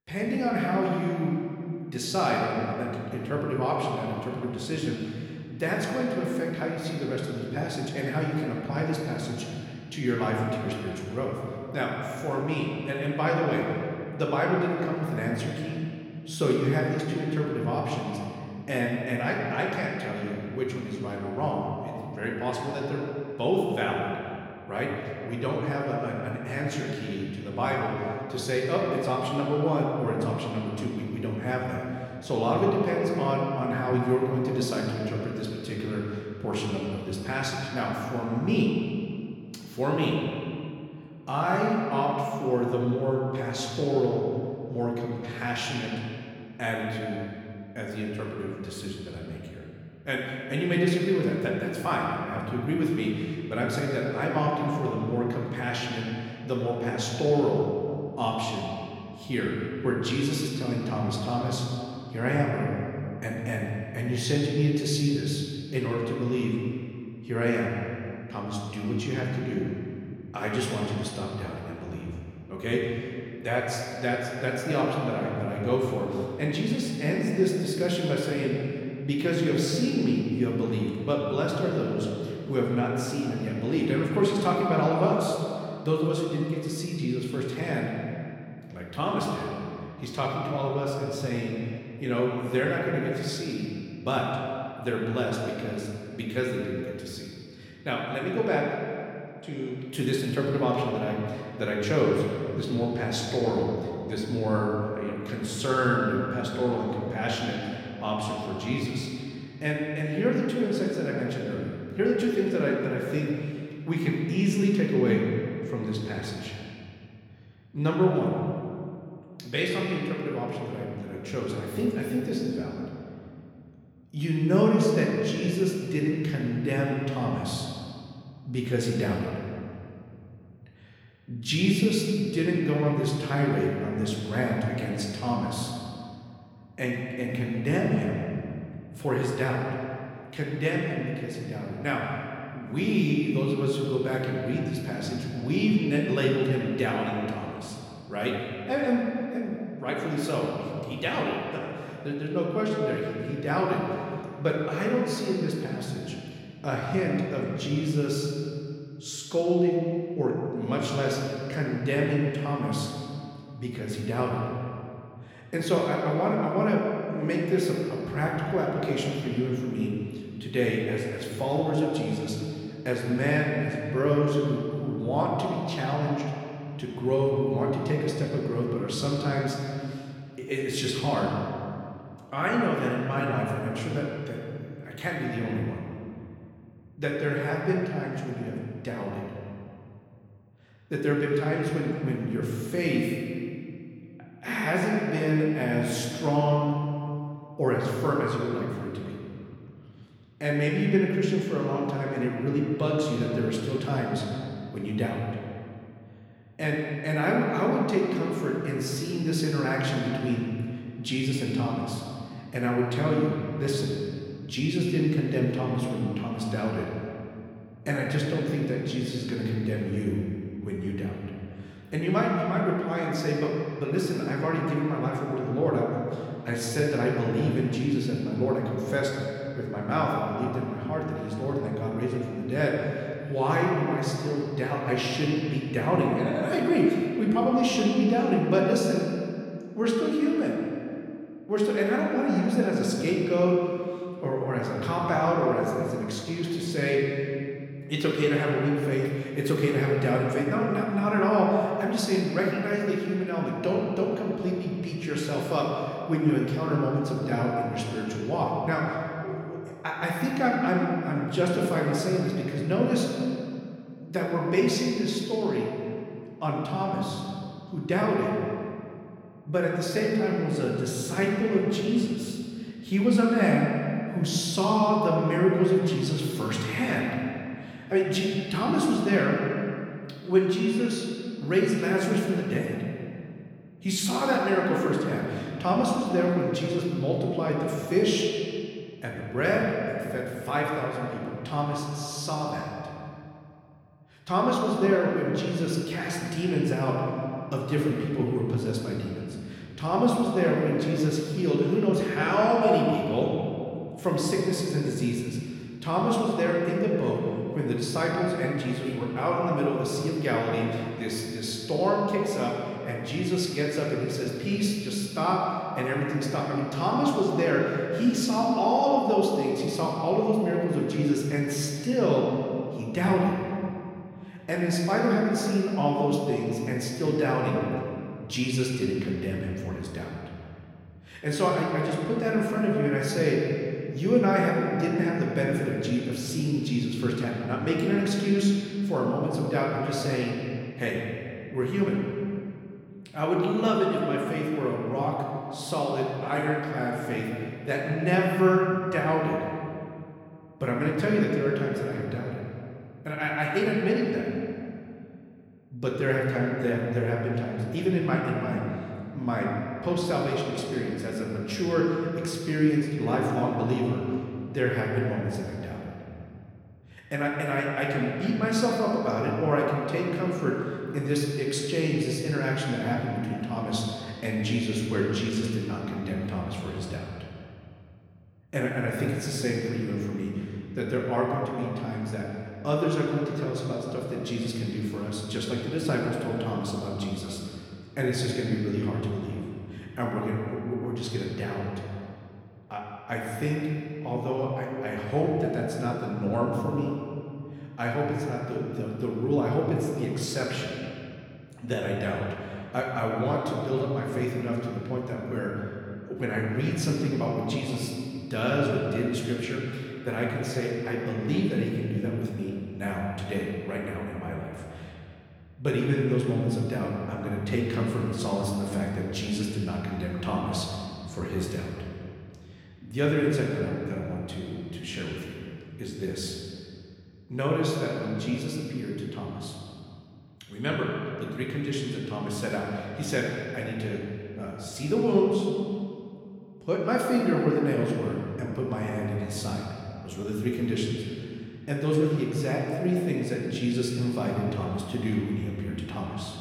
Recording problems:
room echo; noticeable; dies away in 2.3 s
off-mic speech; somewhat distant

